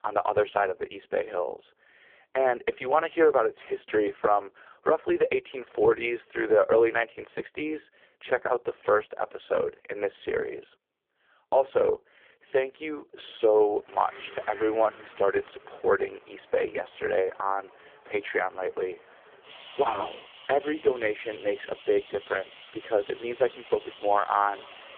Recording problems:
phone-call audio; poor line
traffic noise; noticeable; from 14 s on; 20 dB below the speech

